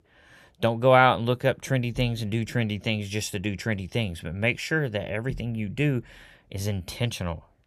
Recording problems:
none

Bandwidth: 14 kHz